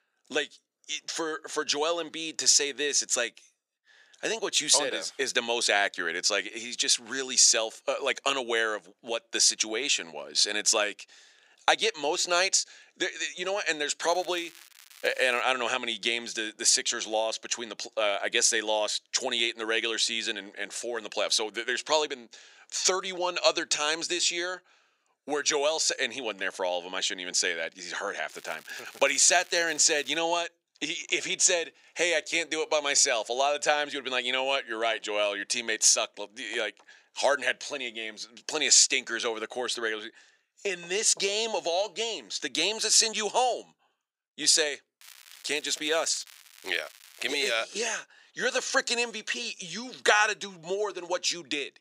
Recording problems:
thin; very; fading below 650 Hz
crackling; faint; from 14 to 15 s, from 28 to 30 s and from 45 to 48 s; 25 dB below the speech

